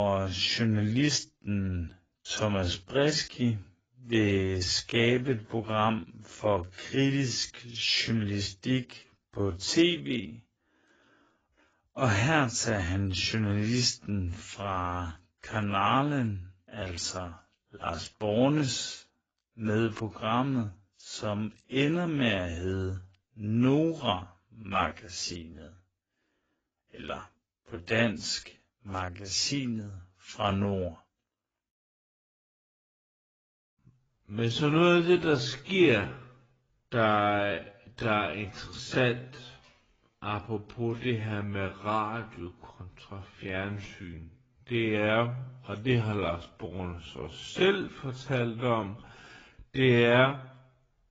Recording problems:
garbled, watery; badly; nothing above 7.5 kHz
wrong speed, natural pitch; too slow; 0.5 times normal speed
abrupt cut into speech; at the start

